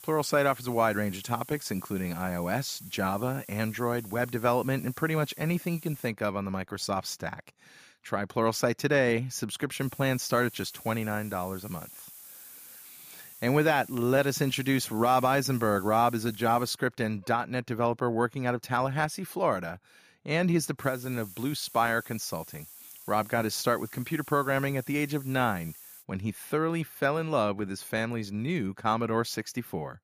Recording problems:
hiss; noticeable; until 6 s, from 10 to 17 s and from 21 to 26 s; 15 dB below the speech

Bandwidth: 15 kHz